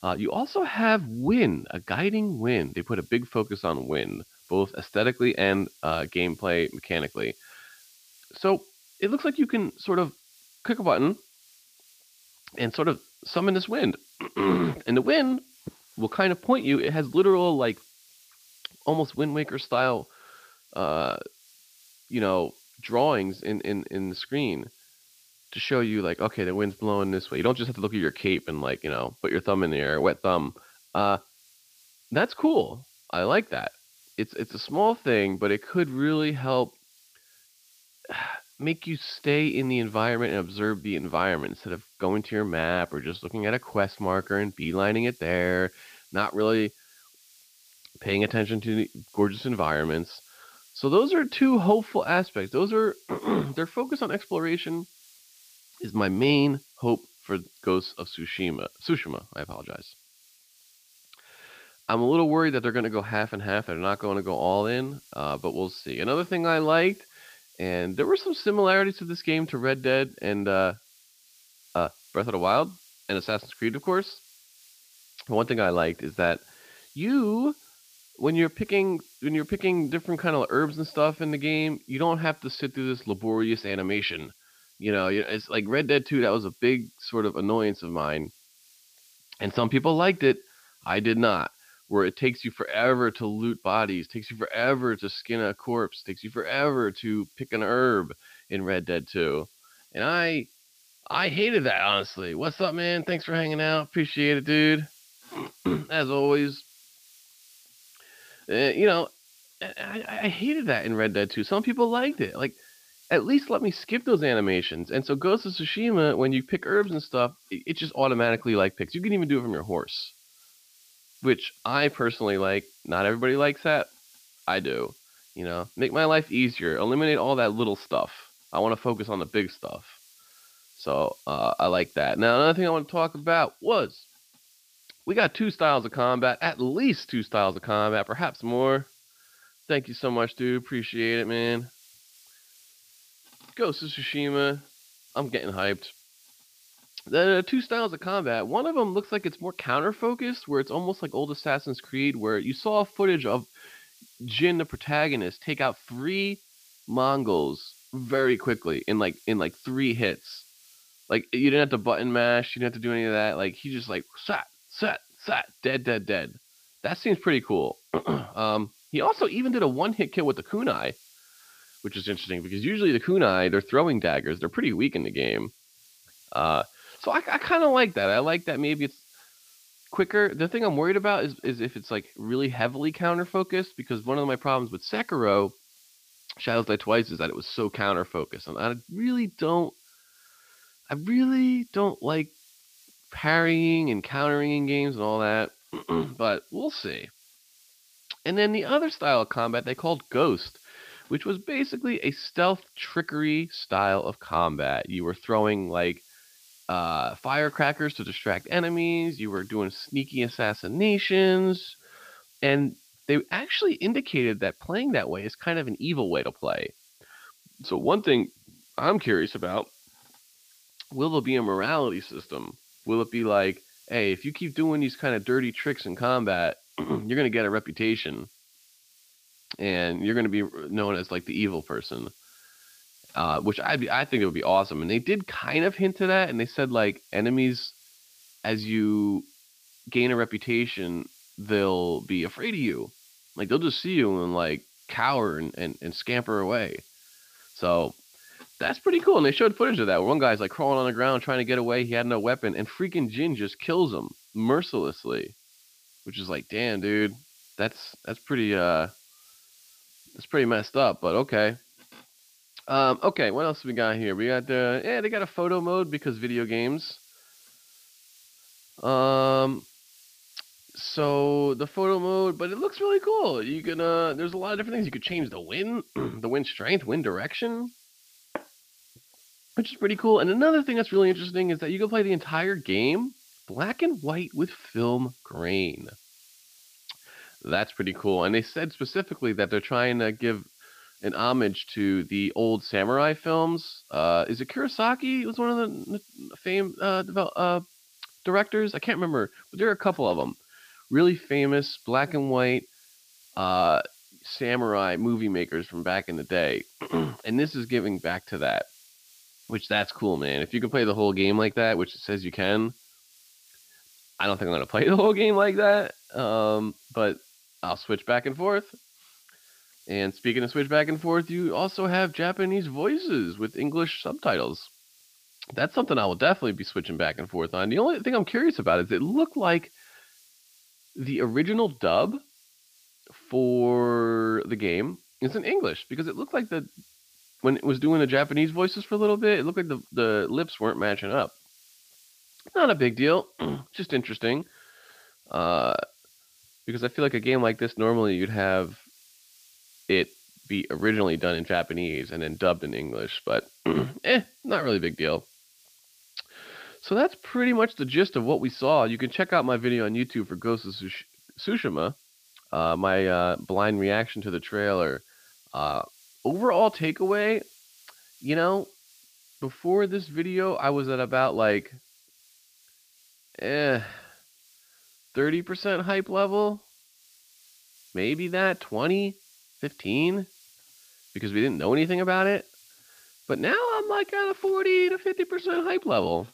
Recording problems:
high frequencies cut off; noticeable; nothing above 5.5 kHz
hiss; faint; throughout; 30 dB below the speech

